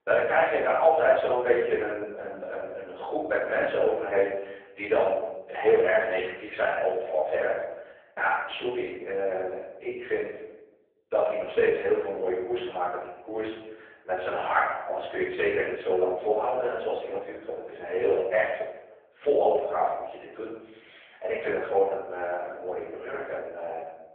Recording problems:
phone-call audio; poor line
off-mic speech; far
room echo; noticeable; dies away in 0.8 s

